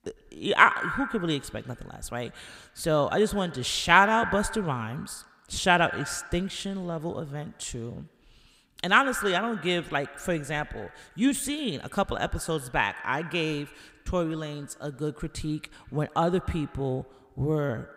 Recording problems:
echo of what is said; strong; throughout; 100 ms later, 10 dB below the speech

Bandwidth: 15.5 kHz